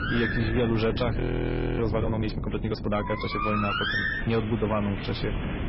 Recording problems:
garbled, watery; badly; nothing above 5.5 kHz
distortion; slight; 10 dB below the speech
animal sounds; loud; throughout; 3 dB below the speech
wind noise on the microphone; occasional gusts; 10 dB below the speech
audio freezing; at 1 s for 0.5 s

